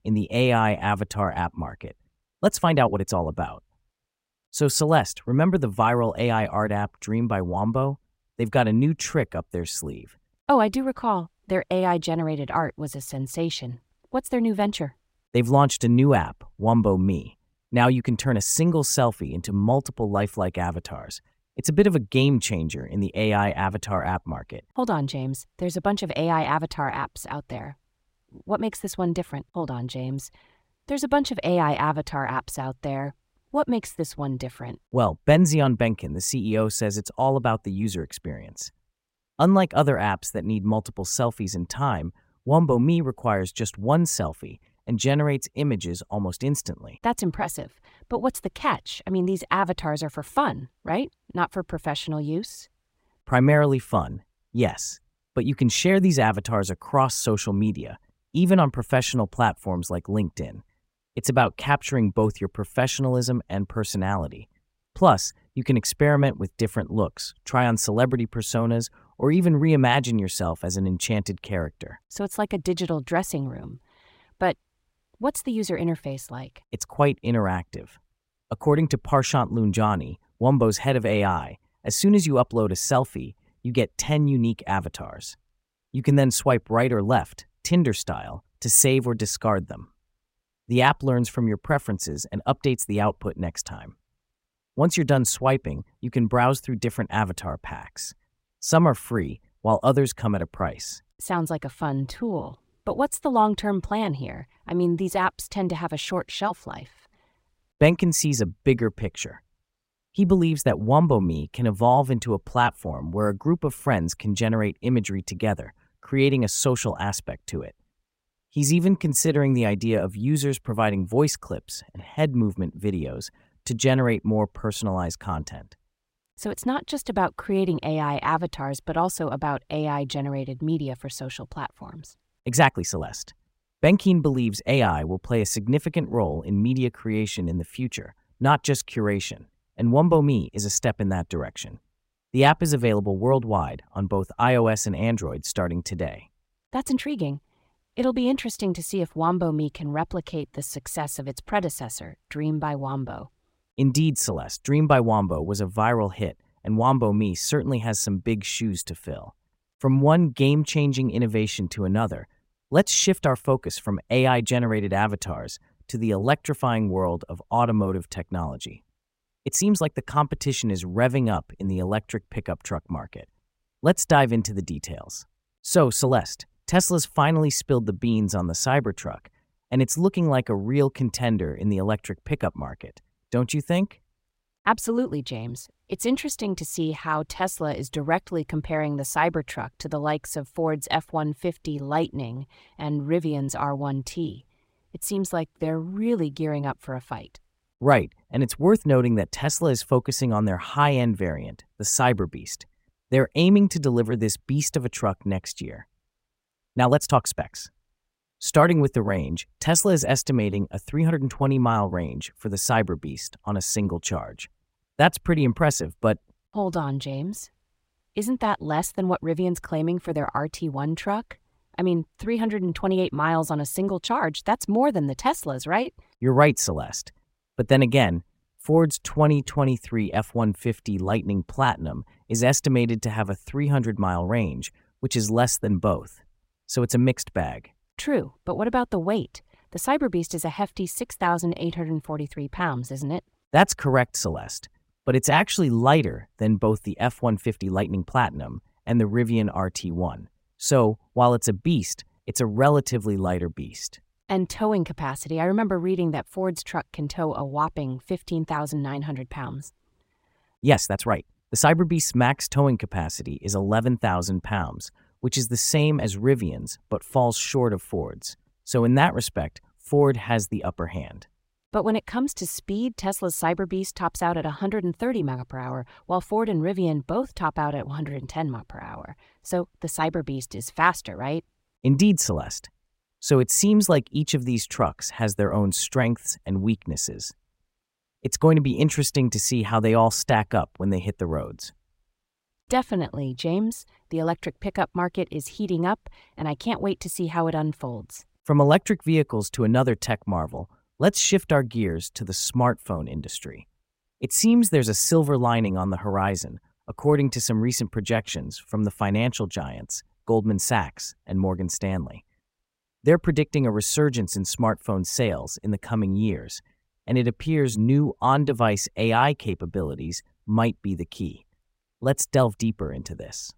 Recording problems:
uneven, jittery; strongly; from 2 s to 5:23

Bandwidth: 16 kHz